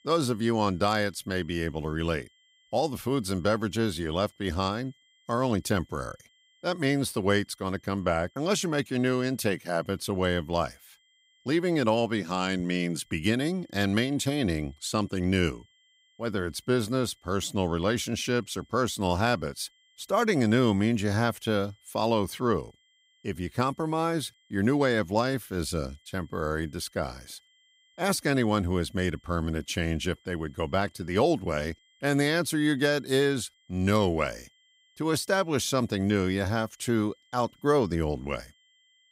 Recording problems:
high-pitched whine; faint; throughout; 3 kHz, 35 dB below the speech

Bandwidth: 15.5 kHz